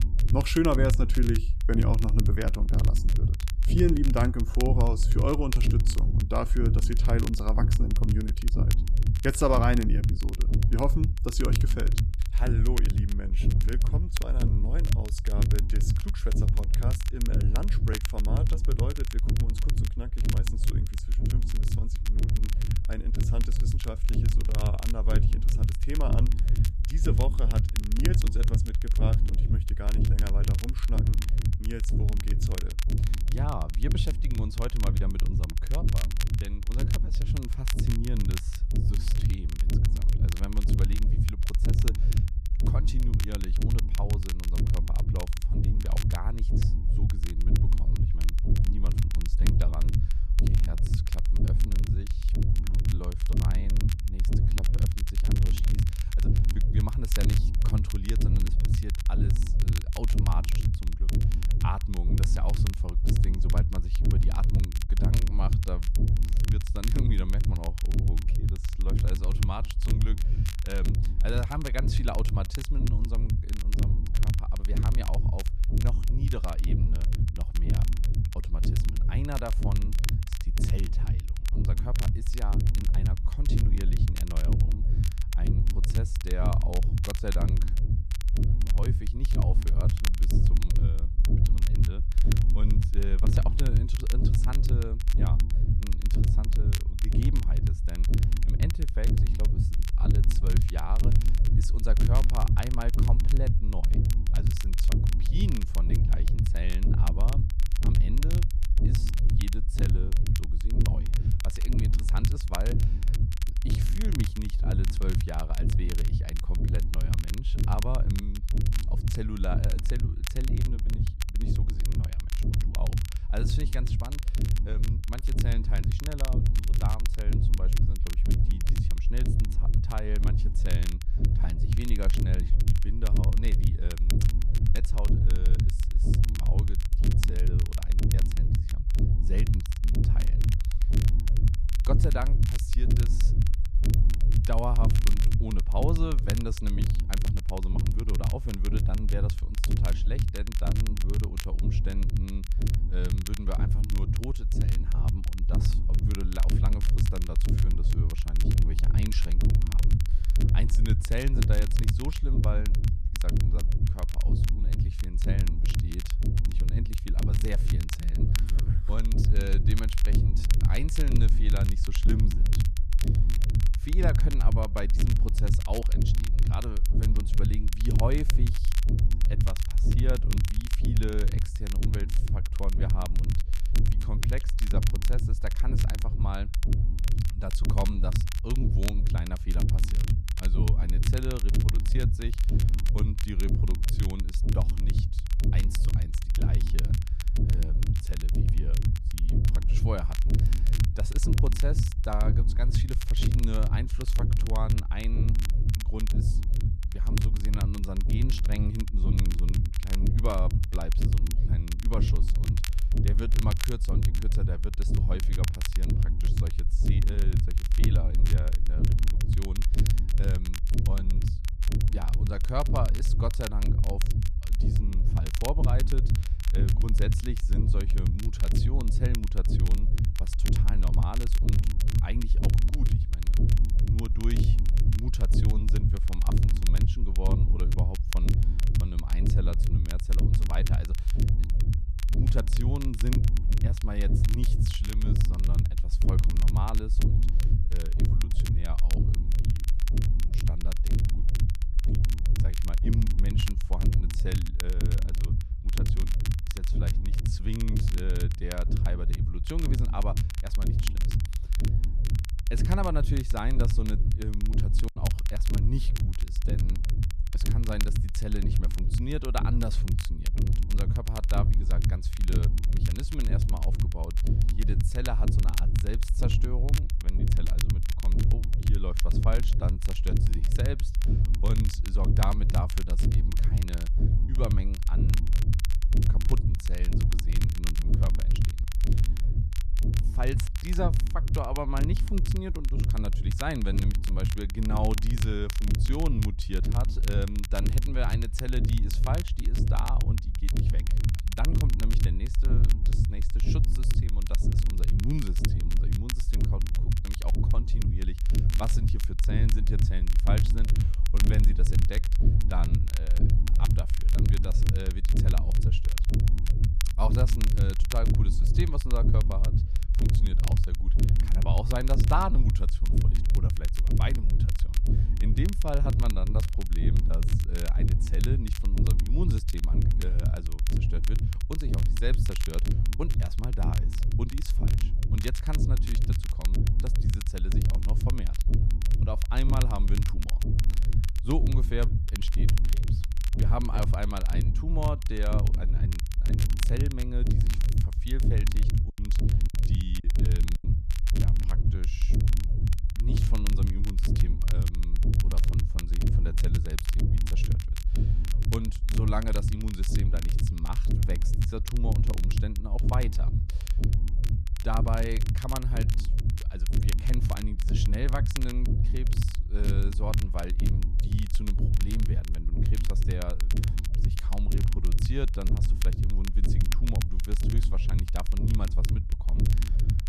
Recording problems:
low rumble; loud; throughout; 4 dB below the speech
crackle, like an old record; loud; 7 dB below the speech
choppy; very; at 4:25 and from 5:49 to 5:51; 6% of the speech affected

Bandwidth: 14.5 kHz